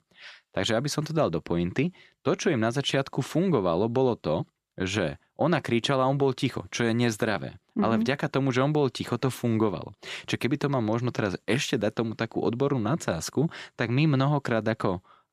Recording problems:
none

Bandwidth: 14.5 kHz